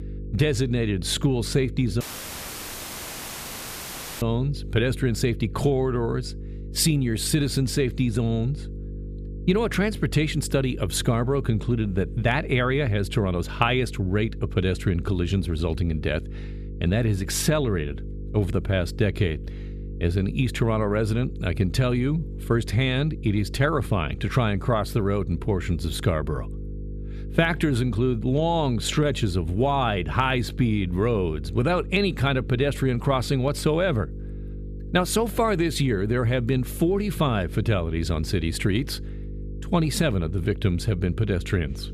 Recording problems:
electrical hum; noticeable; throughout; 50 Hz, 20 dB below the speech
audio cutting out; at 2 s for 2 s

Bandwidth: 14.5 kHz